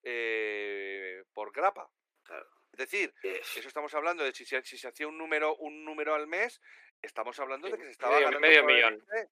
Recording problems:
thin; very; fading below 350 Hz

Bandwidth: 15 kHz